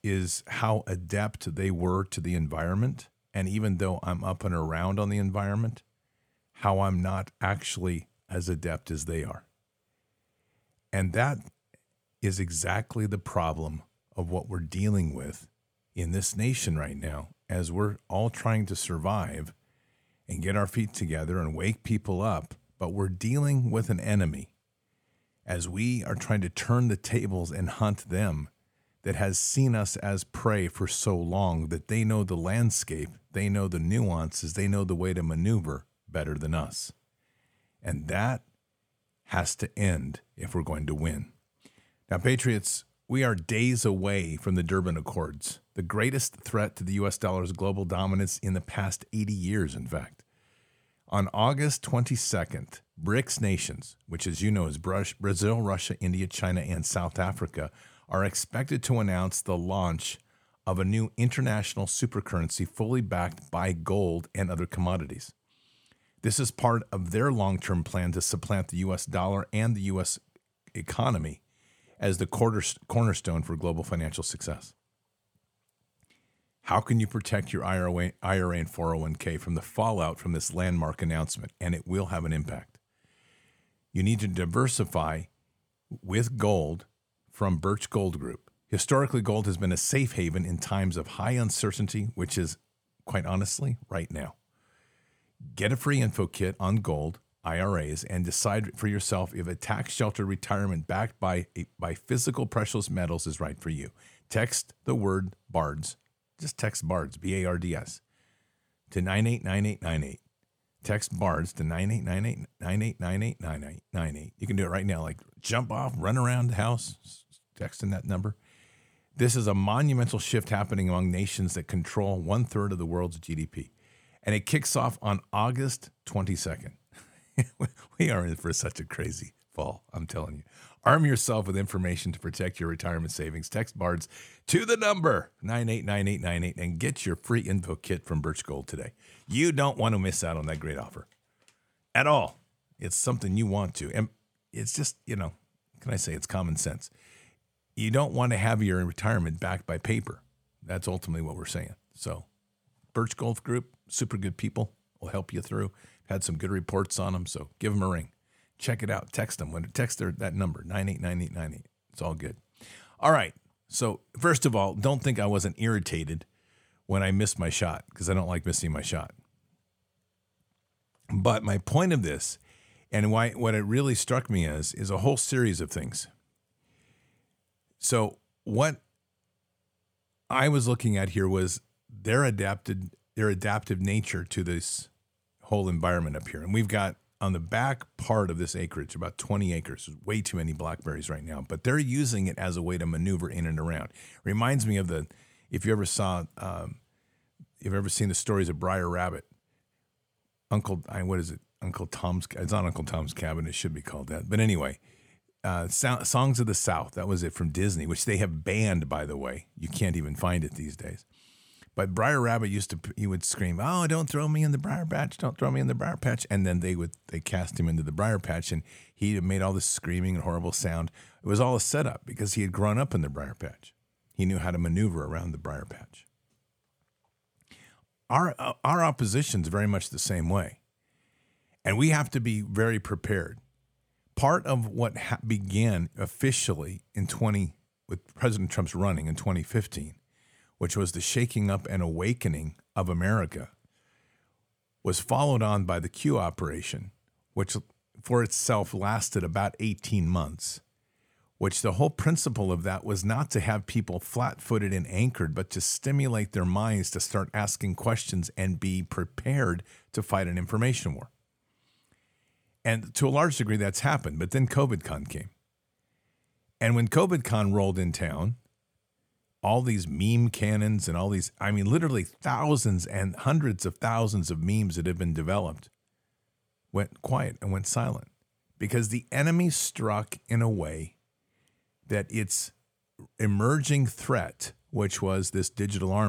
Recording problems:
abrupt cut into speech; at the end

